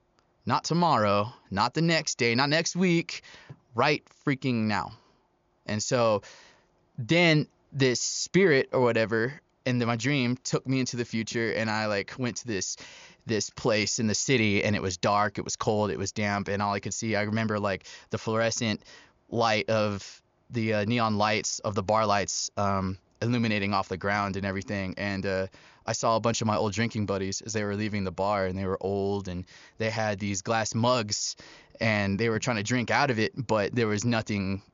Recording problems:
high frequencies cut off; noticeable; nothing above 7 kHz

